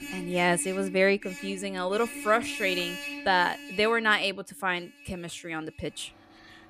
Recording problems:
traffic noise; noticeable; throughout; 10 dB below the speech

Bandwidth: 15 kHz